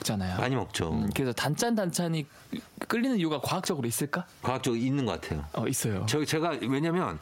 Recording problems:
squashed, flat; heavily

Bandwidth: 16 kHz